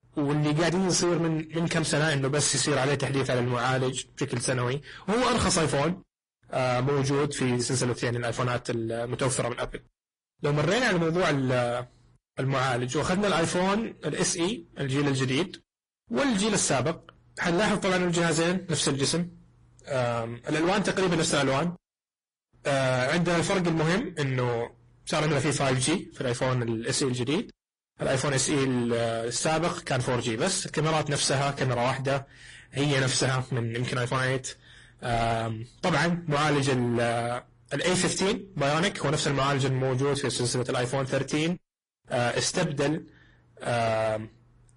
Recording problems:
distortion; heavy; 23% of the sound clipped
garbled, watery; slightly; nothing above 10.5 kHz

